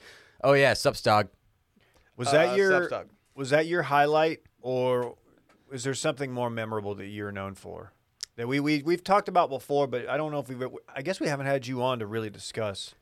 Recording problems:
none

